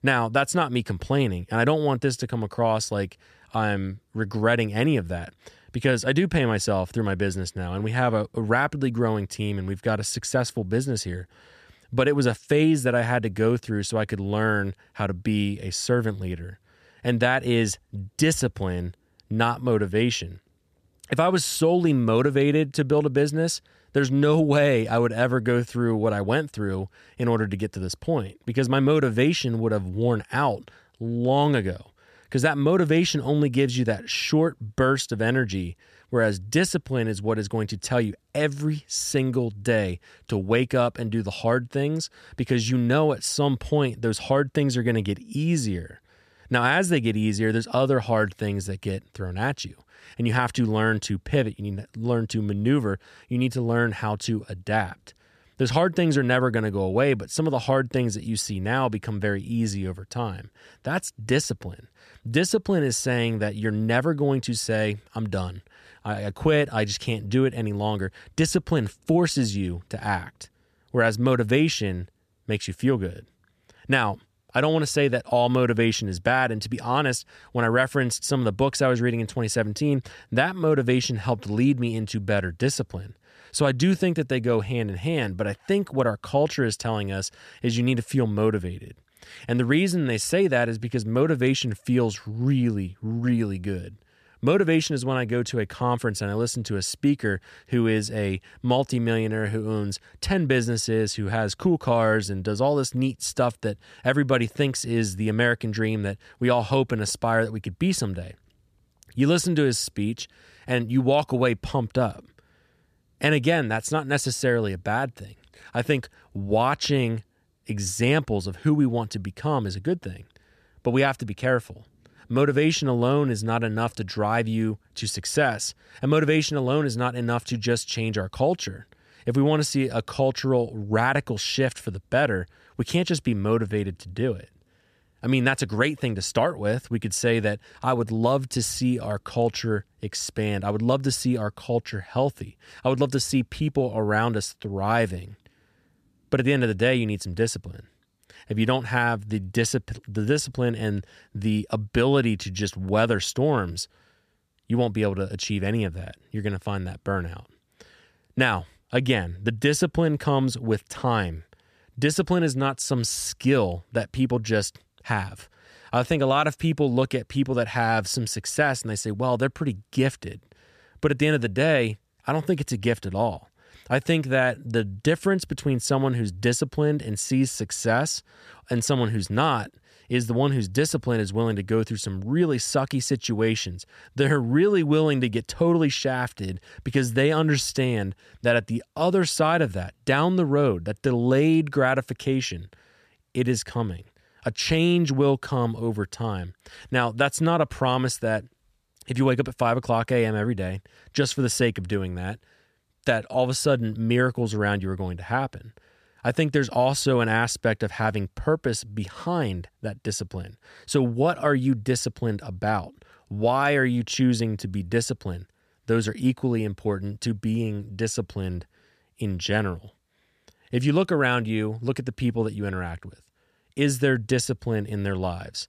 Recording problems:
none

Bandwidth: 14.5 kHz